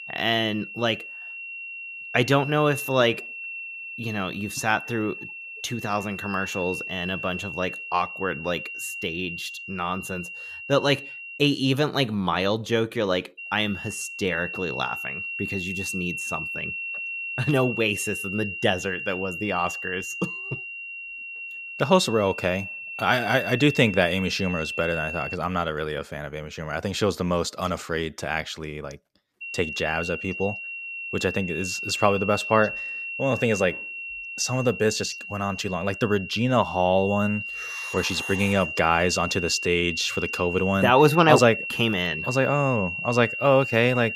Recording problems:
high-pitched whine; loud; until 11 s, from 13 to 25 s and from 29 s on; 3 kHz, 7 dB below the speech

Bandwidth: 14.5 kHz